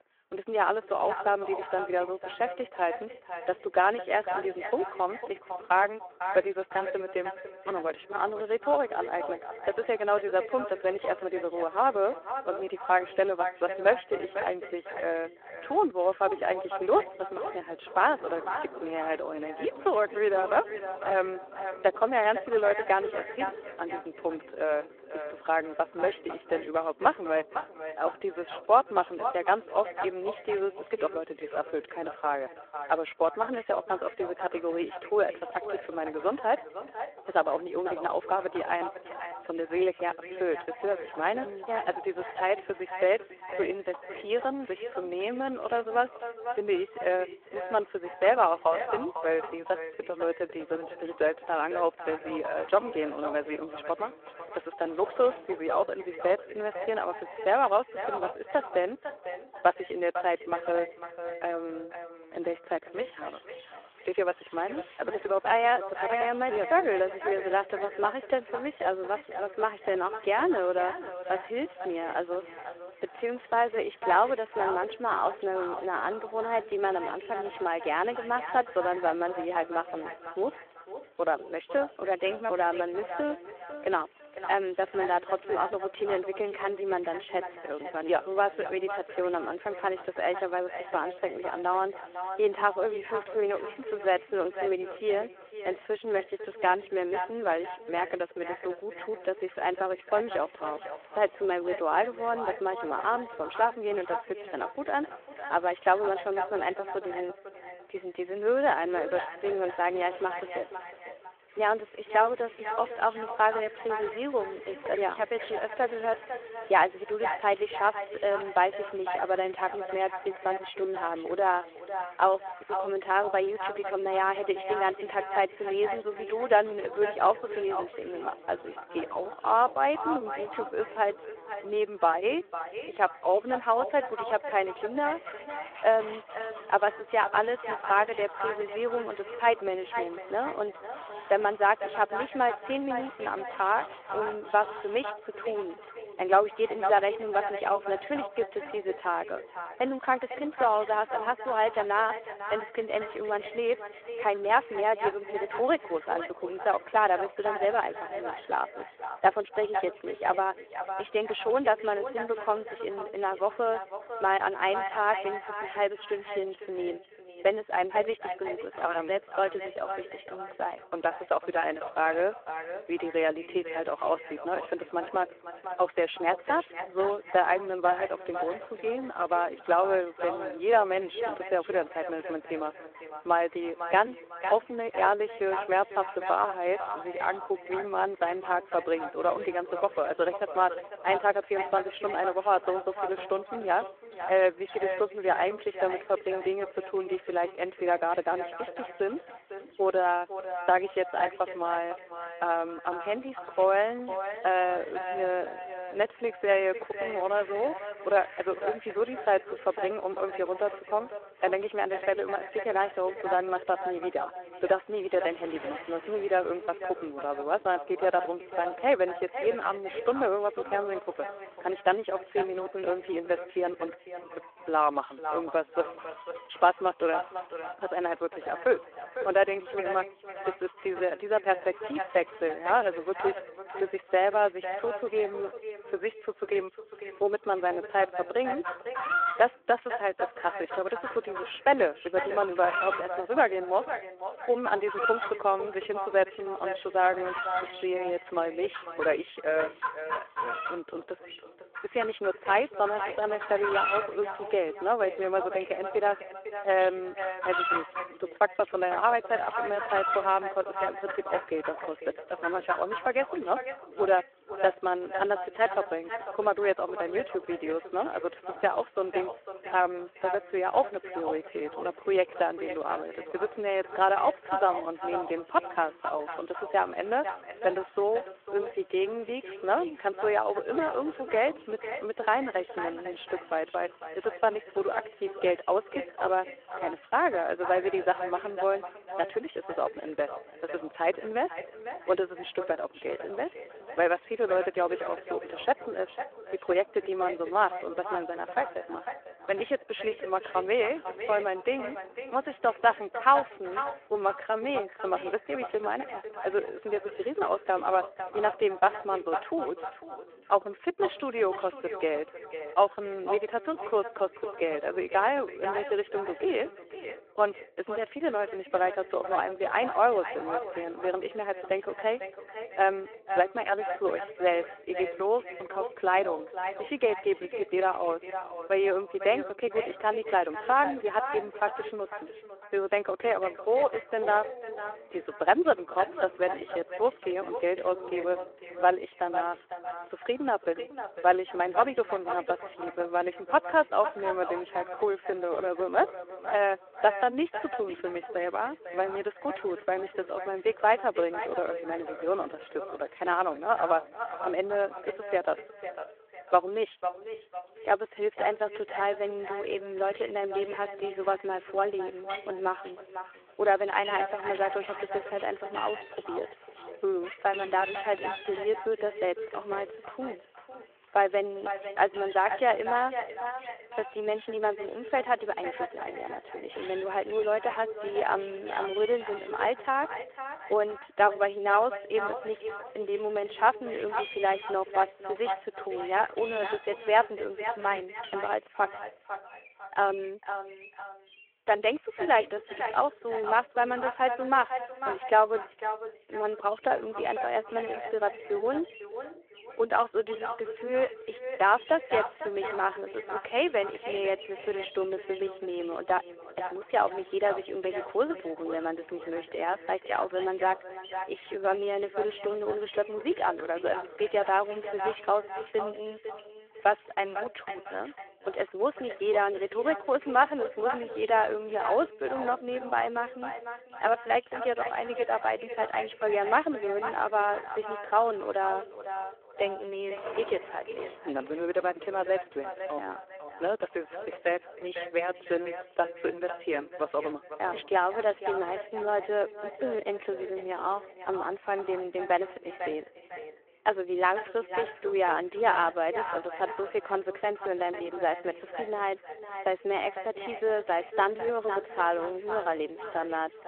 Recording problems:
echo of what is said; strong; throughout; 500 ms later, 10 dB below the speech
phone-call audio
animal sounds; noticeable; throughout; 15 dB below the speech
rain or running water; faint; throughout; 30 dB below the speech

